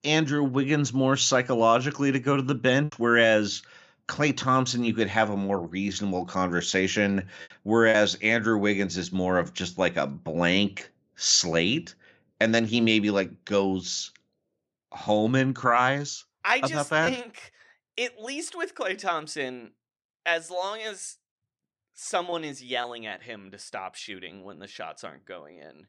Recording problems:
choppy; occasionally; 1% of the speech affected

